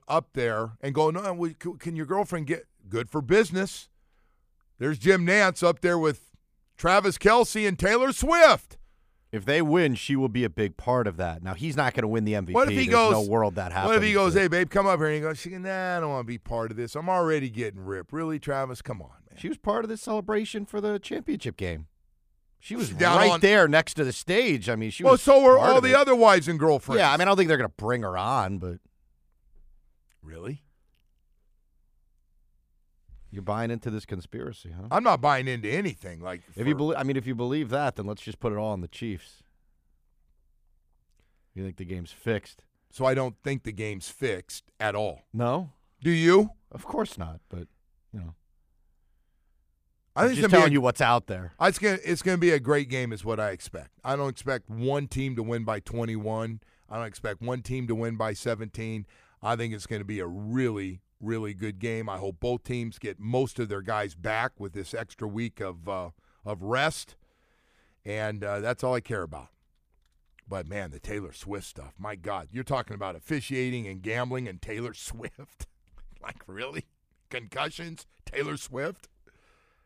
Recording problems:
none

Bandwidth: 15 kHz